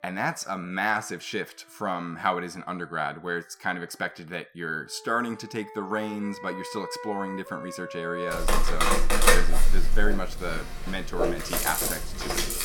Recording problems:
background music; very loud; throughout; 3 dB above the speech

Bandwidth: 17.5 kHz